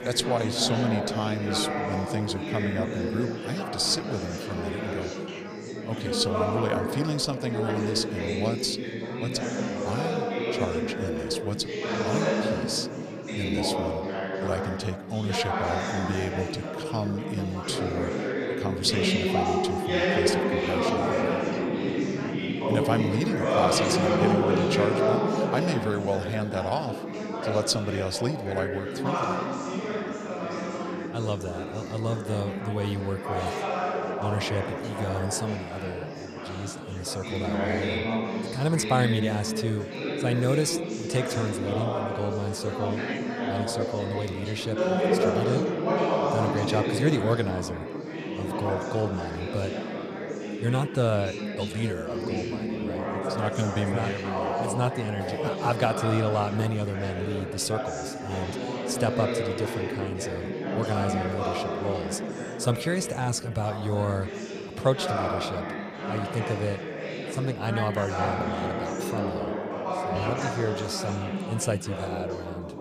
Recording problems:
chatter from many people; very loud; throughout; 1 dB above the speech

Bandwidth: 15 kHz